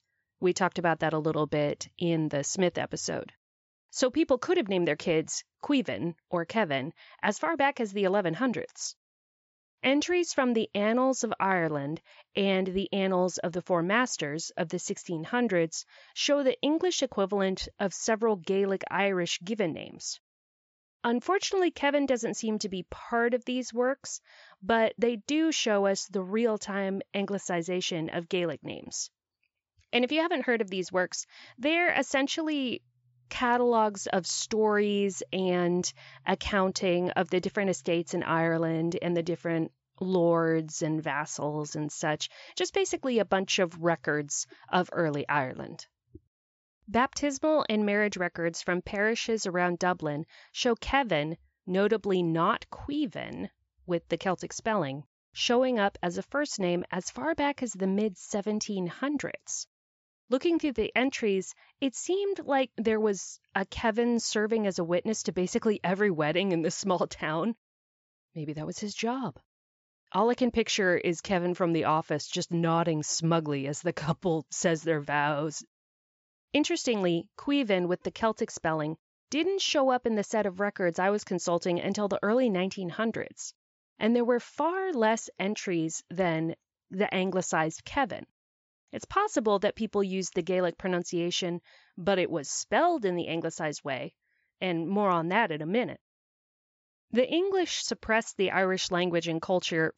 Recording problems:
high frequencies cut off; noticeable; nothing above 8 kHz

